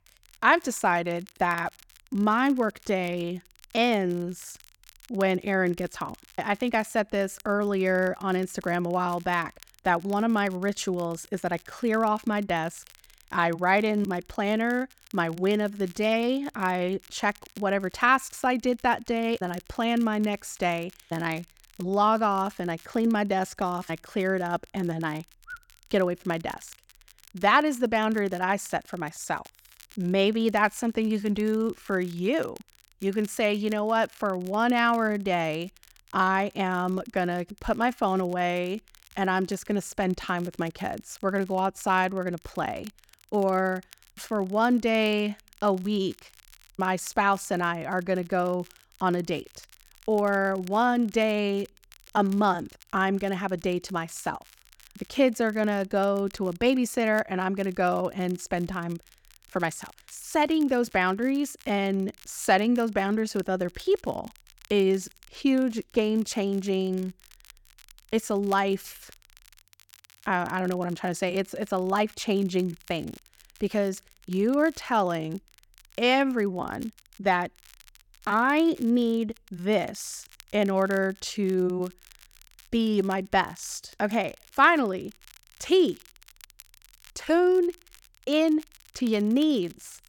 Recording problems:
crackle, like an old record; faint; 25 dB below the speech

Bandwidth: 17.5 kHz